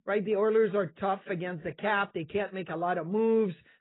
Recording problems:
garbled, watery; badly; nothing above 4 kHz

